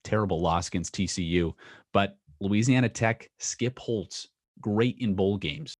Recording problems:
none

